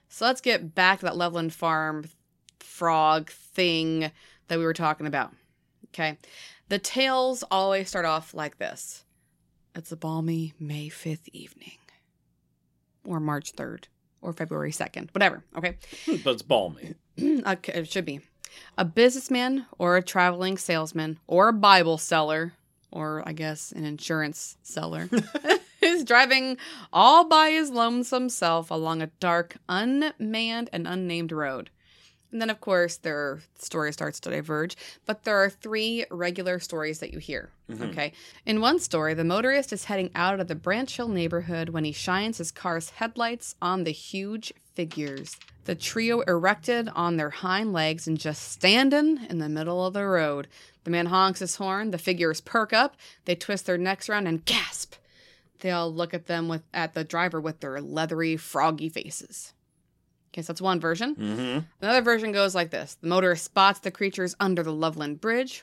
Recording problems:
none

